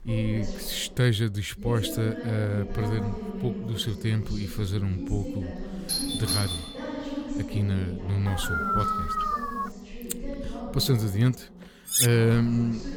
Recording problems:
voice in the background; loud; throughout; 9 dB below the speech
doorbell; loud; from 6 to 7 s; peak level with the speech
dog barking; loud; from 8.5 to 9.5 s; peak 2 dB above the speech
clattering dishes; loud; at 12 s; peak 5 dB above the speech

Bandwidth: 19 kHz